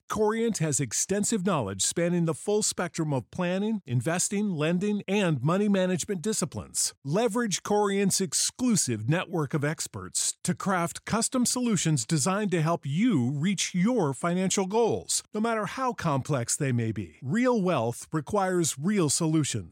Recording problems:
none

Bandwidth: 16 kHz